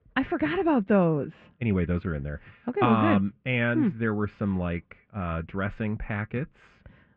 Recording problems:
muffled; very; fading above 2.5 kHz

